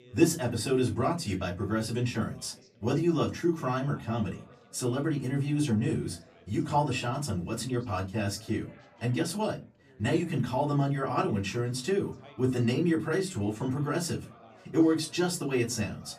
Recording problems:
off-mic speech; far
room echo; very slight; dies away in 0.2 s
background chatter; faint; throughout; 4 voices, 25 dB below the speech

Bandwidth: 14.5 kHz